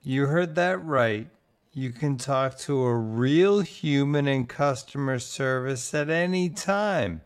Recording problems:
wrong speed, natural pitch; too slow; 0.6 times normal speed

